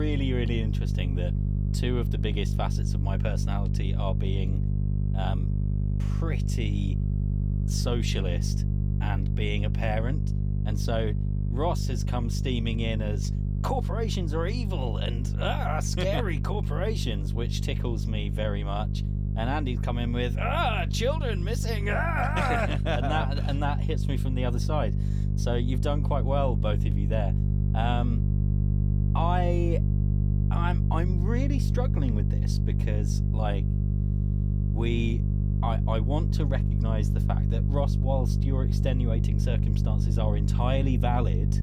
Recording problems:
electrical hum; loud; throughout; 50 Hz, 7 dB below the speech
abrupt cut into speech; at the start

